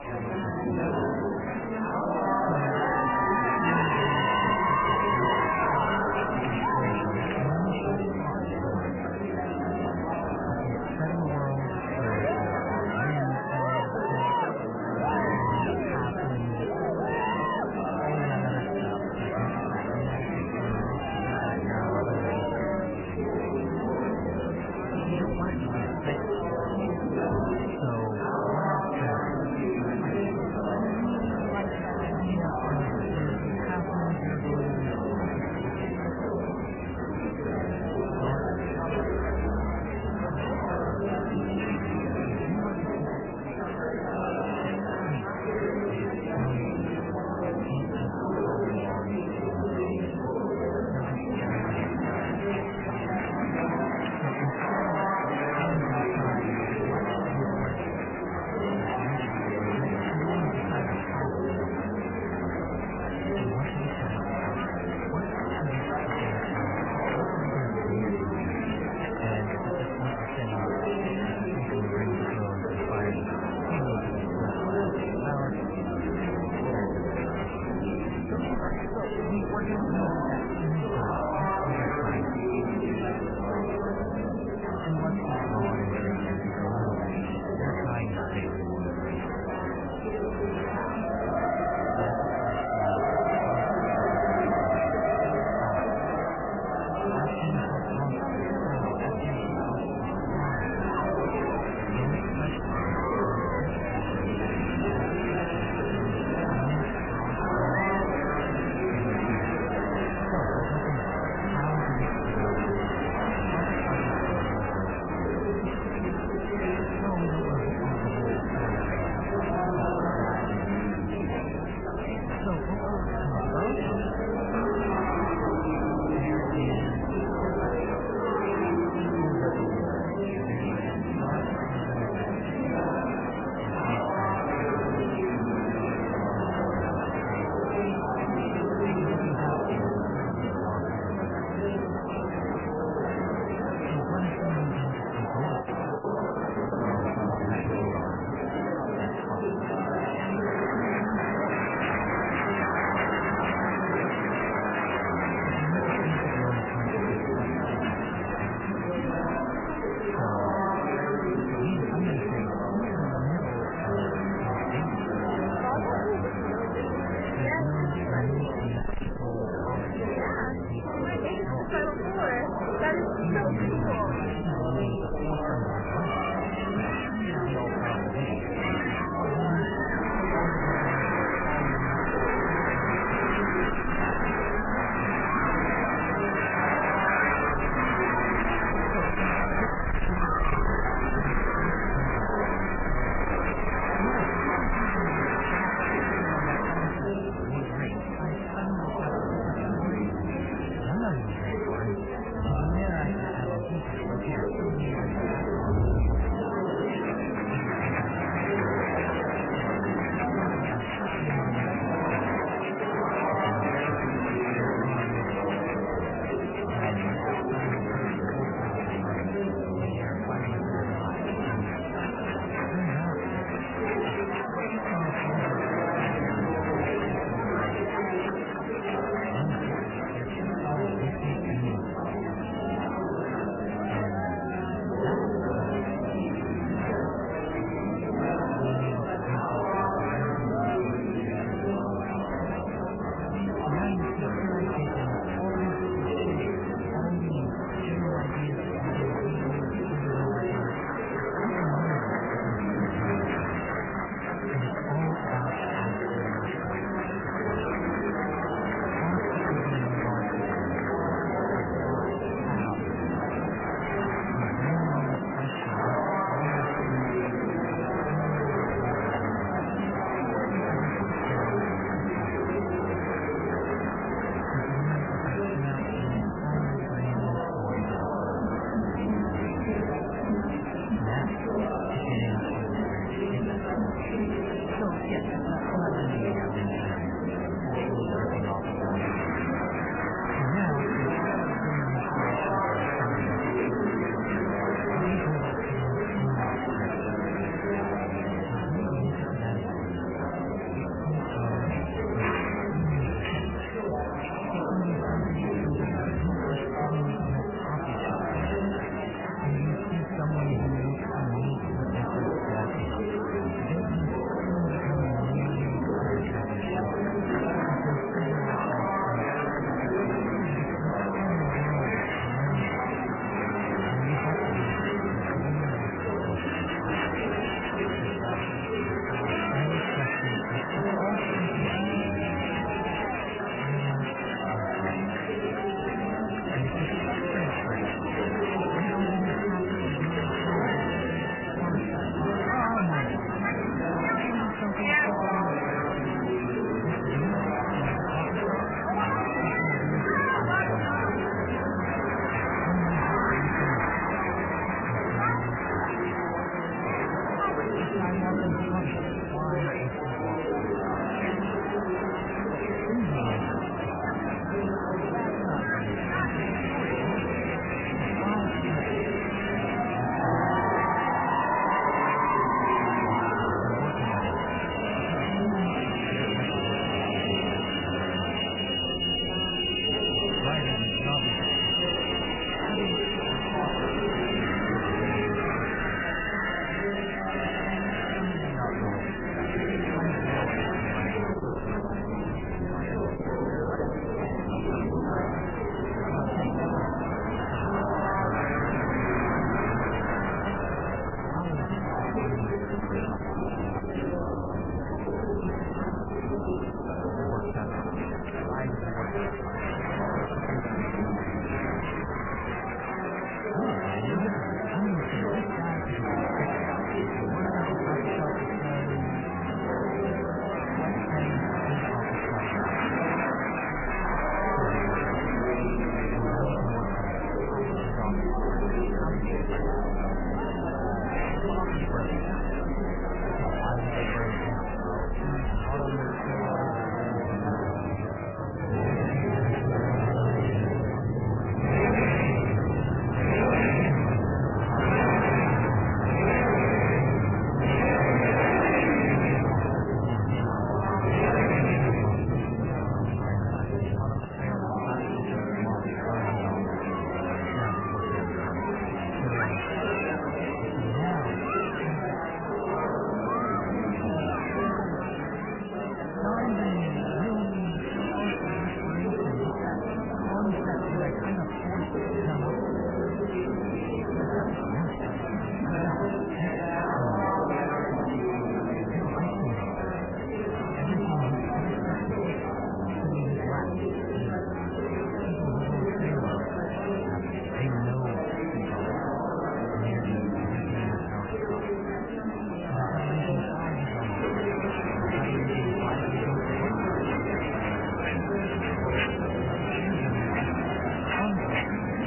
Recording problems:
garbled, watery; badly; nothing above 3 kHz
distortion; slight; 10 dB below the speech
traffic noise; very loud; throughout; 2 dB above the speech
chatter from many people; very loud; throughout; 5 dB above the speech
choppy; very; from 2:26 to 2:28; 10% of the speech affected

